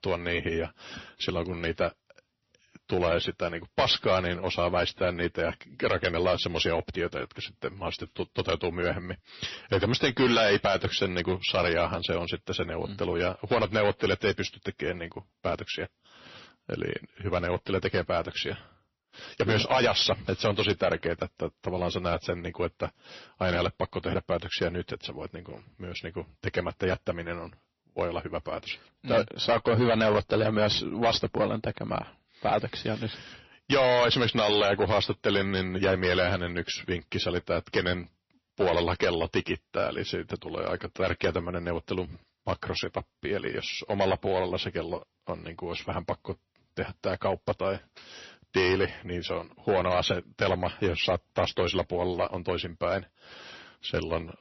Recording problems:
distortion; heavy; 3% of the sound clipped
garbled, watery; slightly; nothing above 6 kHz

